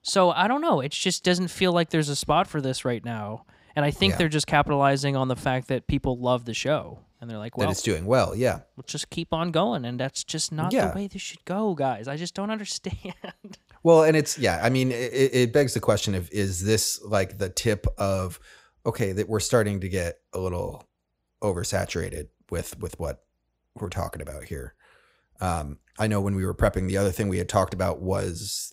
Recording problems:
none

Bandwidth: 15.5 kHz